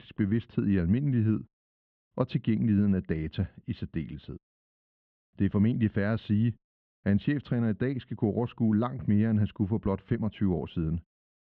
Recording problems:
muffled; slightly; fading above 3.5 kHz

